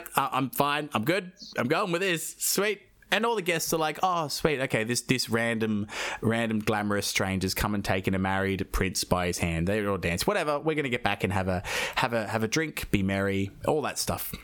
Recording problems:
squashed, flat; somewhat

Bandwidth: 18 kHz